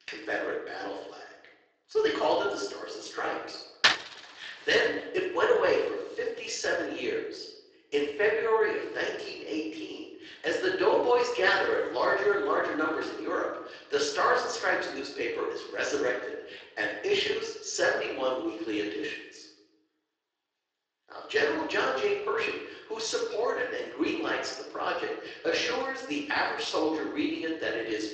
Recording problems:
off-mic speech; far
room echo; noticeable; dies away in 0.8 s
thin; somewhat; fading below 300 Hz
garbled, watery; slightly
door banging; loud; at 4 s; peak 5 dB above the speech

